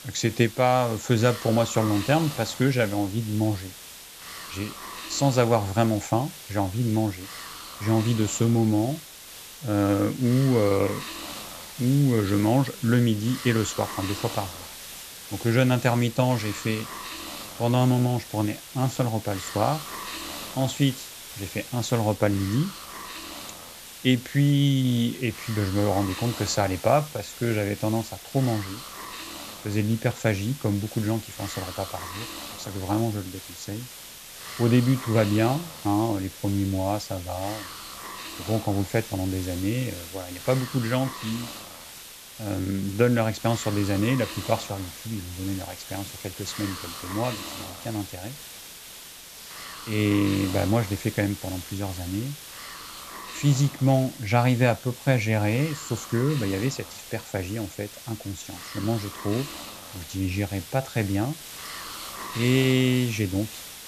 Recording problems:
high frequencies cut off; noticeable; nothing above 7.5 kHz
hiss; noticeable; throughout; 10 dB below the speech

